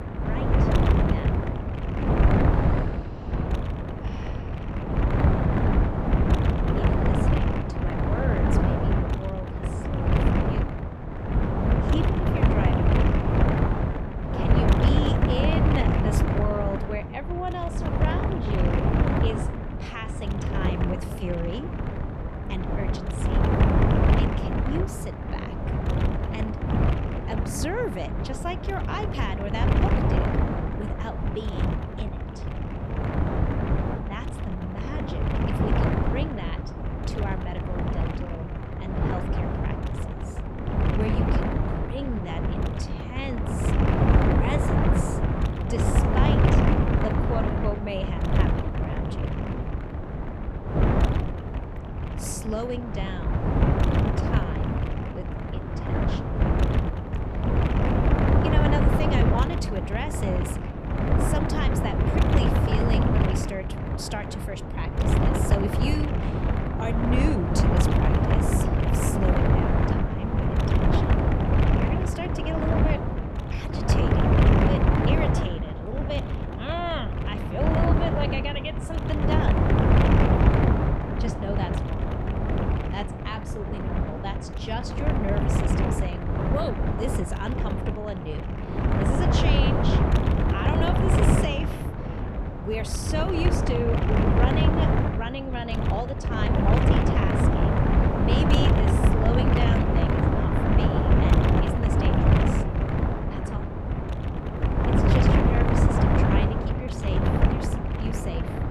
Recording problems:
wind noise on the microphone; heavy; 4 dB above the speech

